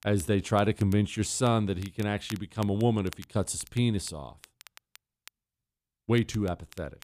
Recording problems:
crackle, like an old record; faint; 20 dB below the speech

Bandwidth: 14.5 kHz